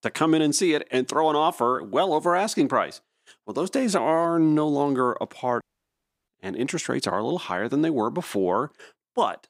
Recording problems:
audio cutting out; at 5.5 s for 0.5 s

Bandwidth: 15.5 kHz